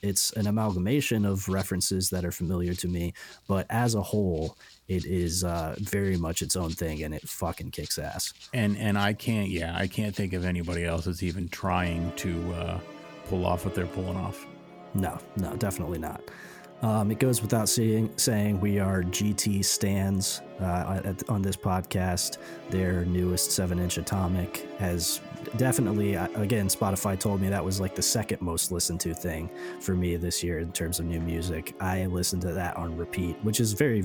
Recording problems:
background music; noticeable; throughout; 15 dB below the speech
abrupt cut into speech; at the end

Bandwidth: 18.5 kHz